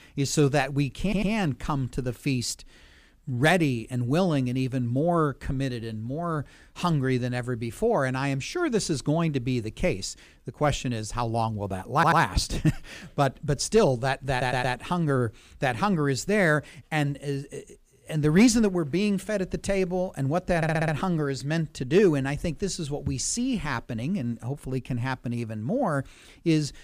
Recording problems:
audio stuttering; 4 times, first at 1 s

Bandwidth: 15 kHz